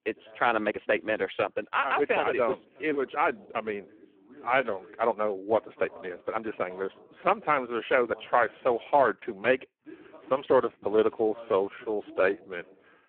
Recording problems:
phone-call audio; poor line
voice in the background; faint; throughout; 25 dB below the speech
uneven, jittery; strongly; from 0.5 to 13 s

